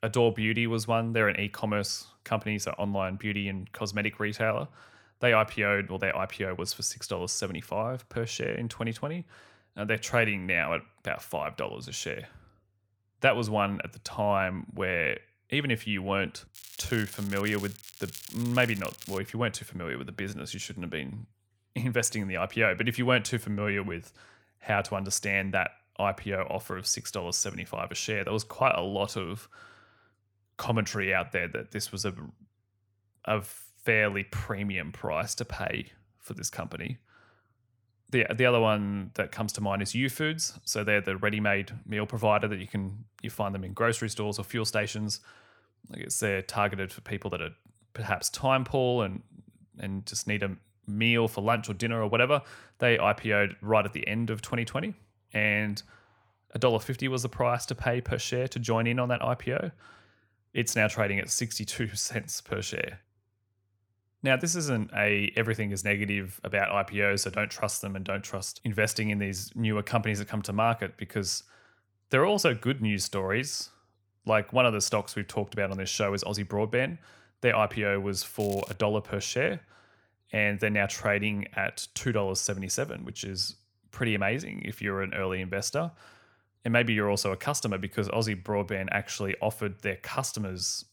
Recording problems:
crackling; noticeable; from 17 to 19 s and at 1:18; 15 dB below the speech

